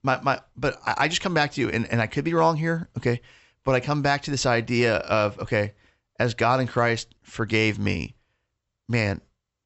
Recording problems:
high frequencies cut off; noticeable; nothing above 7.5 kHz

